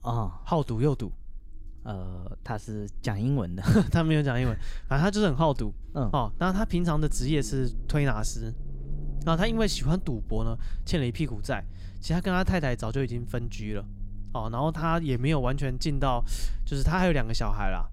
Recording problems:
low rumble; faint; throughout; 25 dB below the speech

